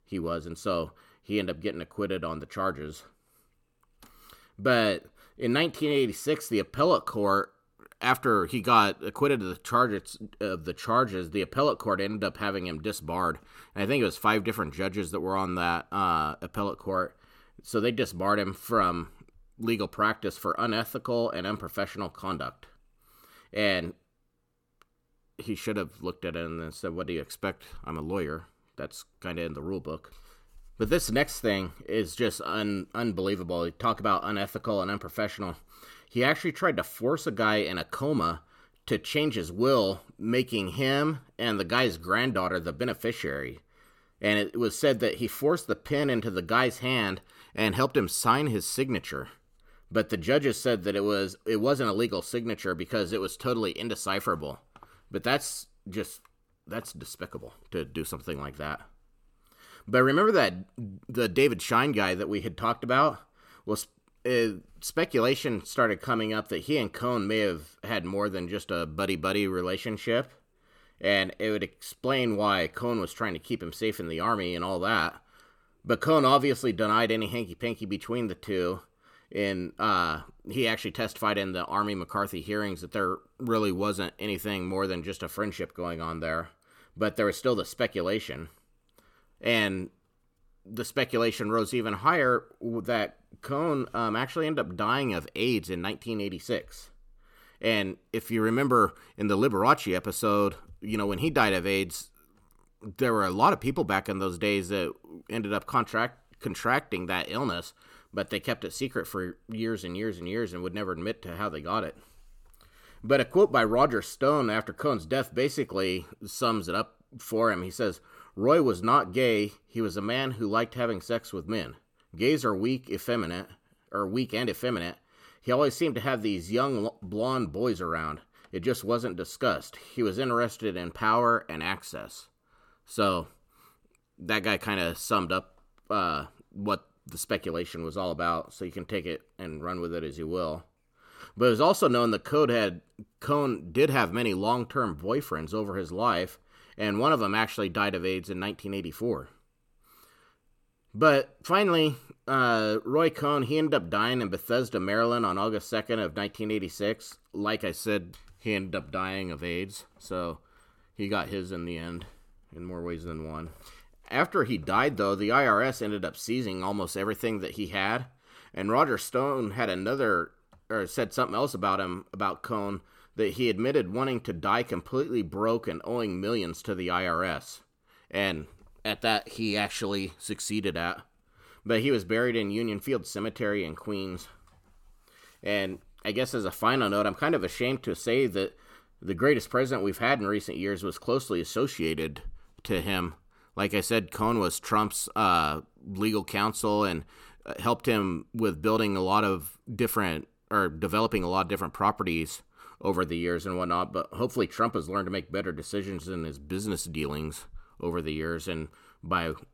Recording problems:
none

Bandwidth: 17.5 kHz